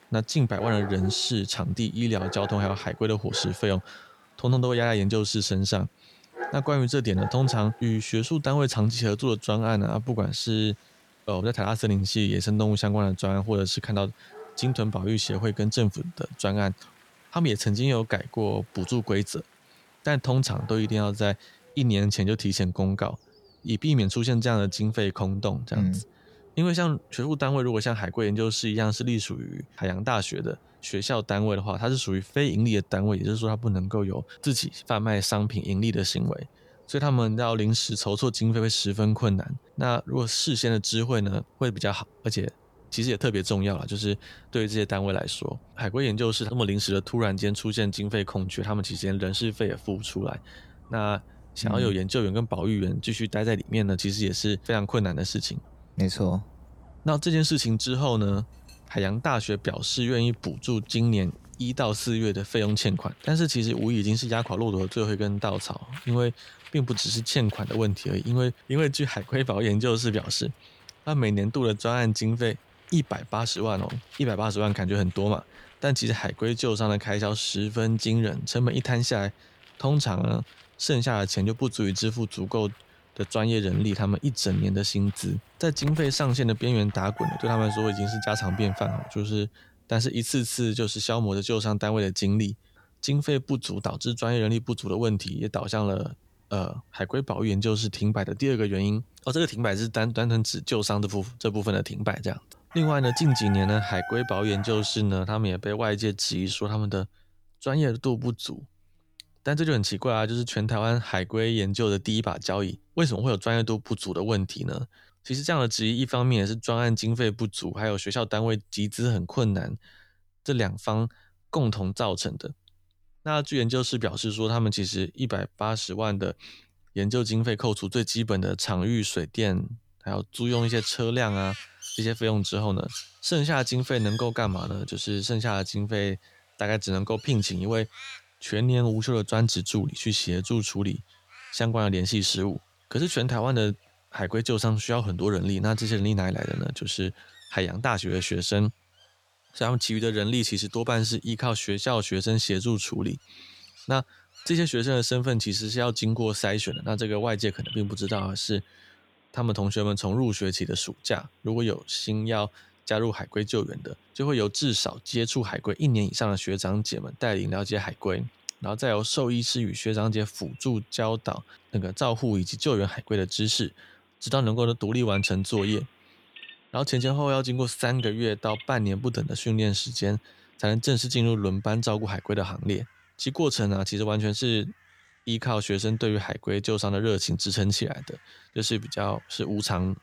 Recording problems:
animal sounds; noticeable; throughout; 20 dB below the speech

